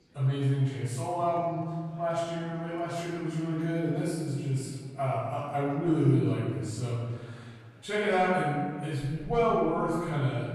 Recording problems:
room echo; strong; dies away in 1.5 s
off-mic speech; far
murmuring crowd; faint; throughout; 25 dB below the speech

